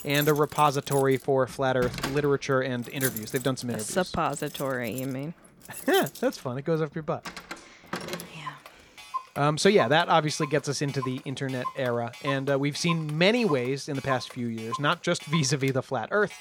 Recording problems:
household noises; noticeable; throughout; 10 dB below the speech

